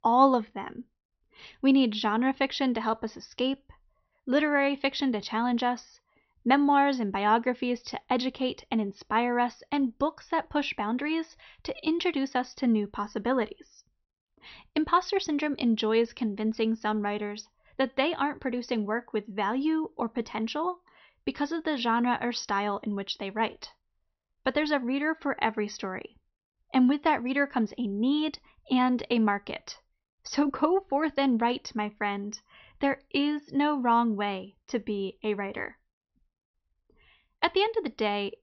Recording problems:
high frequencies cut off; noticeable; nothing above 6 kHz

